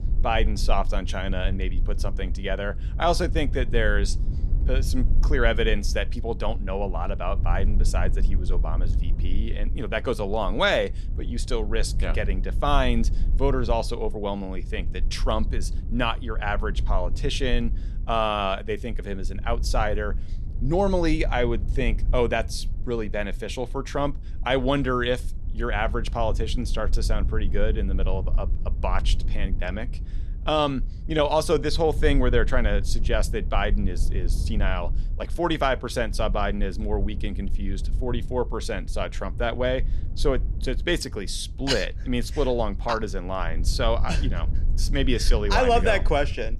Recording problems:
low rumble; faint; throughout; 20 dB below the speech

